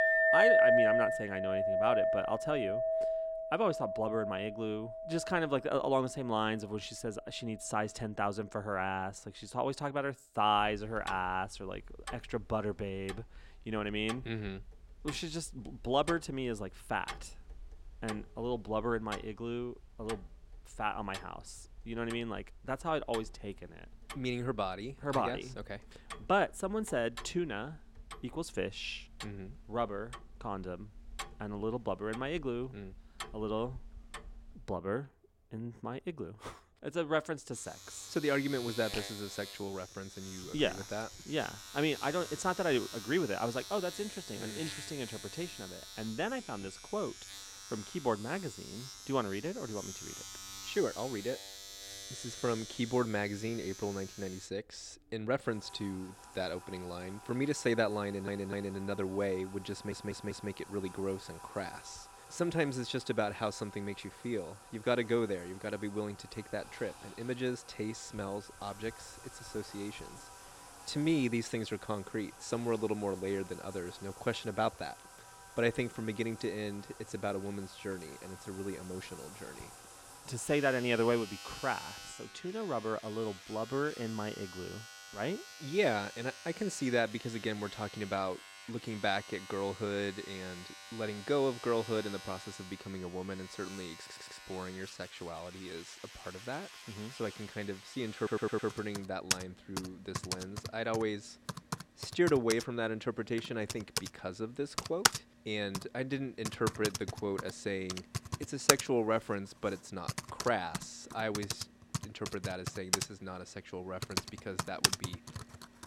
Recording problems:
household noises; loud; throughout; 3 dB below the speech
audio stuttering; 4 times, first at 58 s

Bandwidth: 16.5 kHz